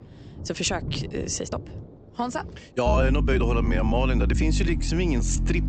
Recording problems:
high frequencies cut off; noticeable; nothing above 8 kHz
electrical hum; noticeable; from 3 s on; 50 Hz, 10 dB below the speech
rain or running water; noticeable; throughout; 10 dB below the speech
uneven, jittery; strongly

